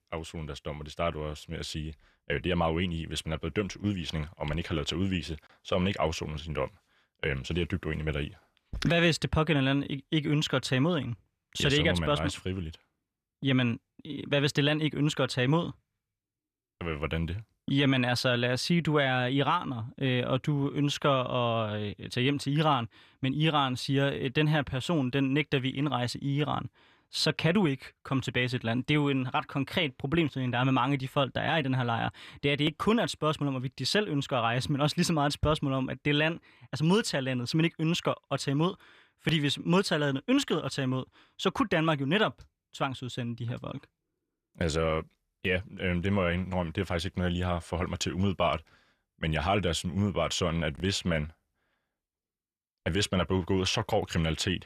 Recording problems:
none

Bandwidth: 14.5 kHz